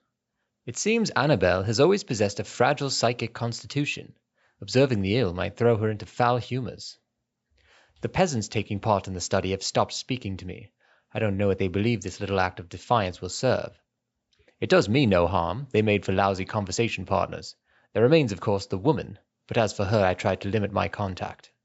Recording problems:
high frequencies cut off; noticeable; nothing above 7.5 kHz

